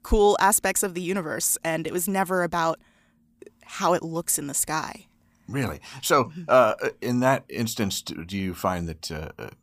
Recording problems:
none

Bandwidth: 15 kHz